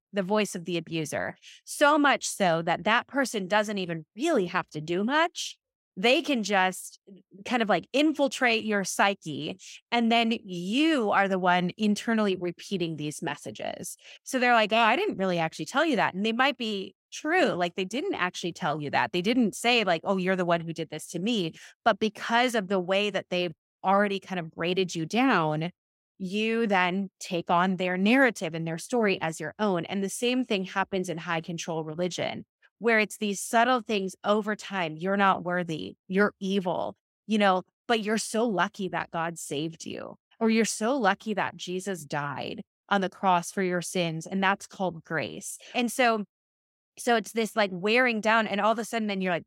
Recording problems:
none

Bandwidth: 16 kHz